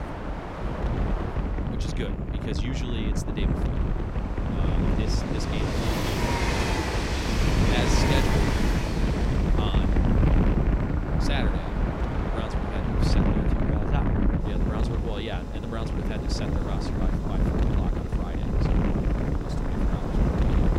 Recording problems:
train or aircraft noise; very loud; throughout; 3 dB above the speech
wind noise on the microphone; heavy; 3 dB above the speech

